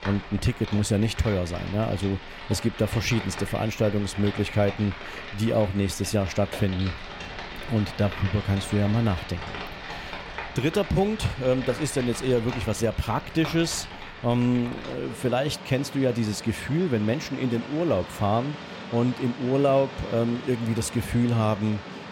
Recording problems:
rain or running water; noticeable; throughout; 10 dB below the speech

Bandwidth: 16 kHz